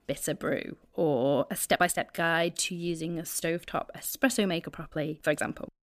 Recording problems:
uneven, jittery; strongly; from 1 to 5.5 s

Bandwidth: 15 kHz